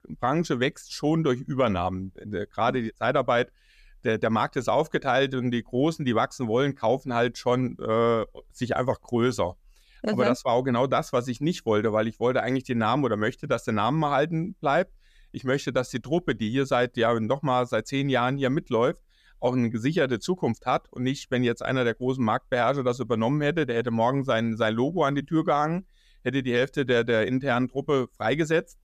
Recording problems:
none

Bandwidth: 14.5 kHz